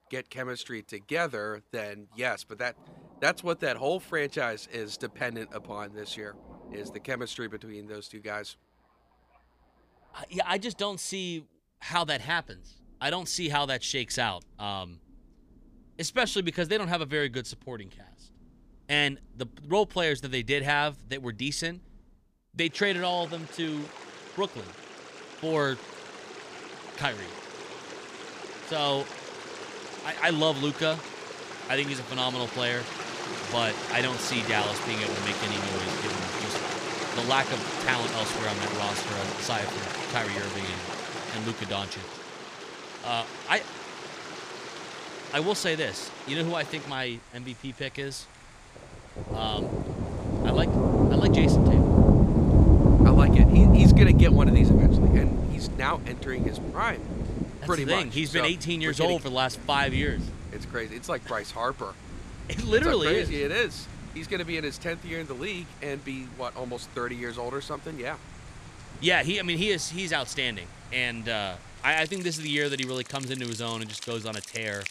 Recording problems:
rain or running water; very loud; throughout; 5 dB above the speech

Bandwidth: 15 kHz